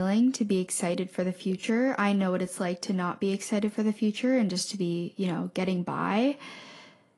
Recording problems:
garbled, watery; slightly; nothing above 10.5 kHz
abrupt cut into speech; at the start

